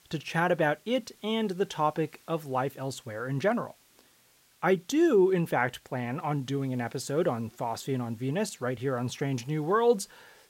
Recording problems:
hiss; faint; throughout; 30 dB below the speech

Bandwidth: 16 kHz